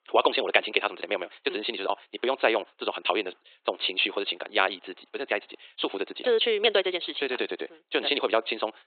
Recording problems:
thin; very; fading below 400 Hz
high frequencies cut off; severe; nothing above 4 kHz
wrong speed, natural pitch; too fast; 1.7 times normal speed

